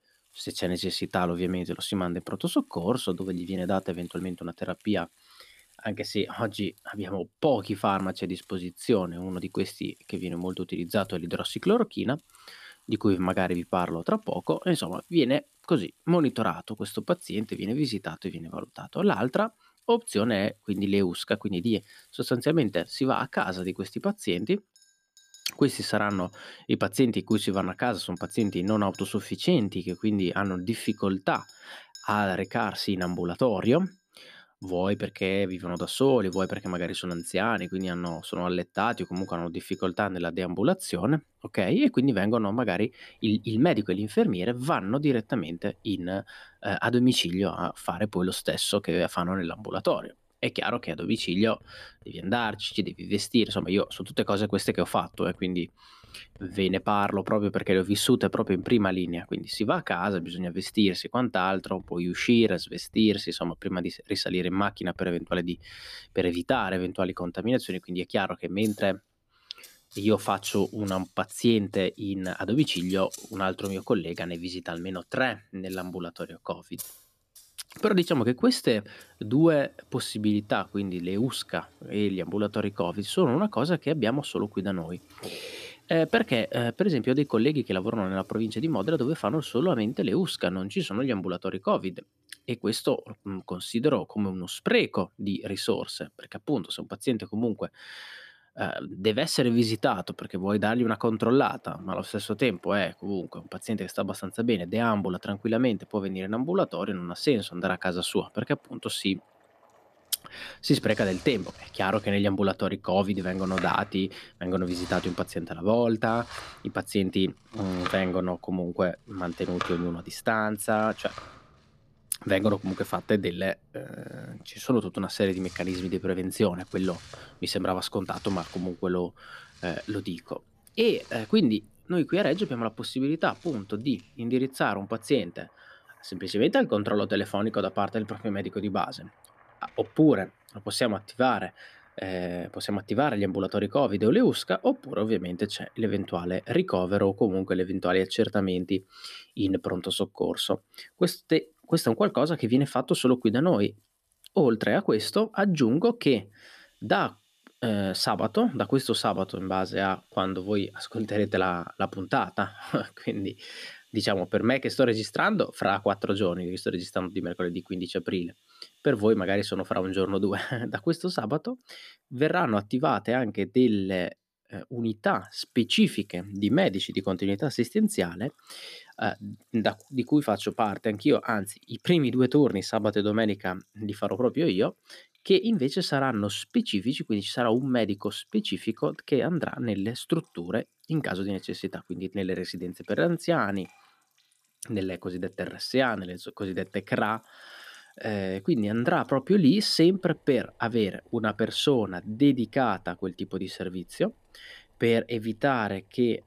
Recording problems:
household noises; faint; throughout; 25 dB below the speech

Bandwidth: 14.5 kHz